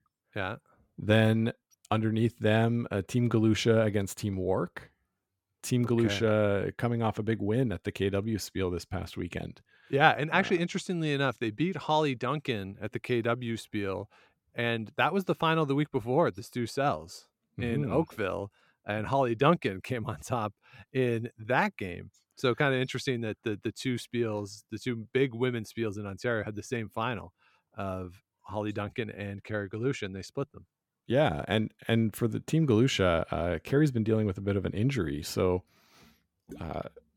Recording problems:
none

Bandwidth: 17.5 kHz